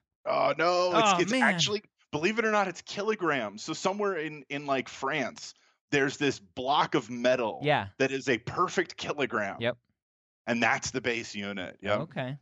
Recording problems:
none

